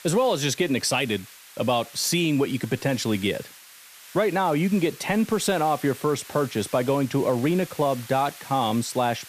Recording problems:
hiss; noticeable; throughout; 20 dB below the speech

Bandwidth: 14.5 kHz